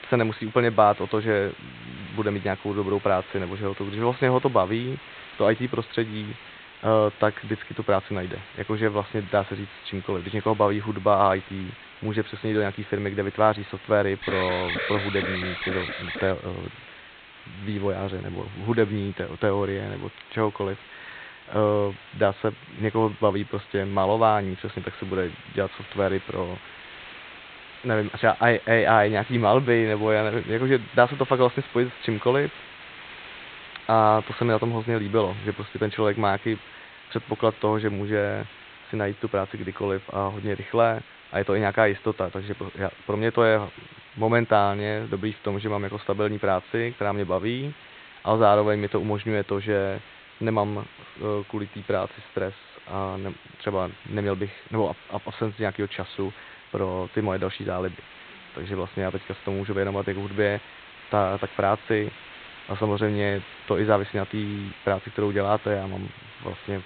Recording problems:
high frequencies cut off; severe; nothing above 4 kHz
hiss; noticeable; throughout; 20 dB below the speech
alarm; noticeable; from 14 to 16 s; peak 2 dB below the speech

